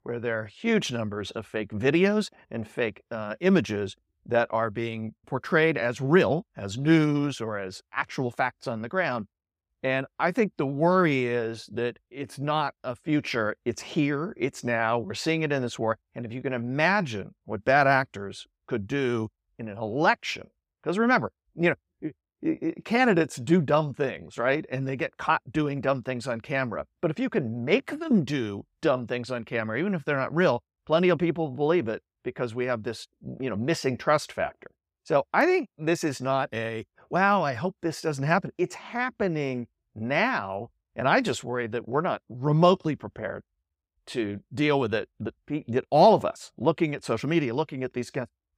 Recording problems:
none

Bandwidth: 15.5 kHz